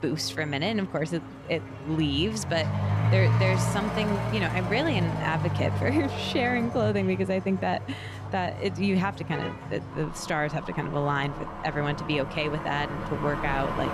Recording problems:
traffic noise; loud; throughout; 3 dB below the speech

